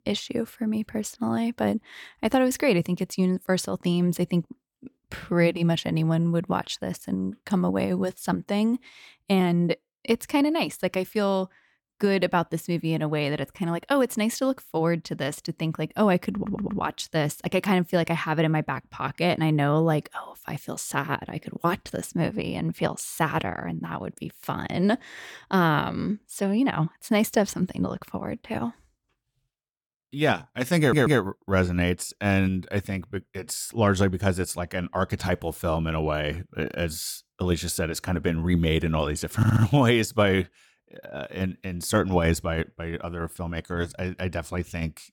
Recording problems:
audio stuttering; at 16 s, at 31 s and at 39 s

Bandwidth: 18 kHz